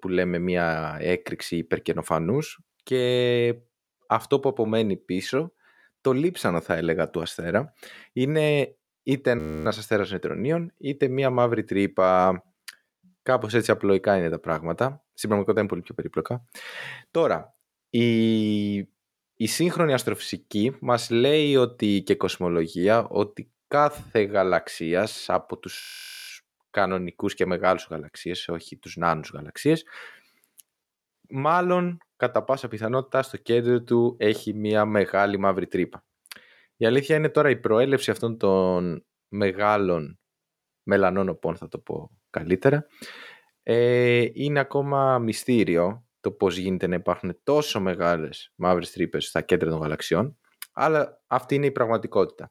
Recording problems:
audio freezing; at 9.5 s and at 26 s

